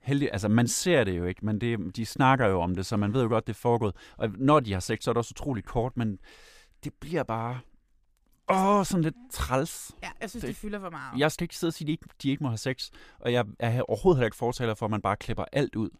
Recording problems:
none

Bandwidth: 15 kHz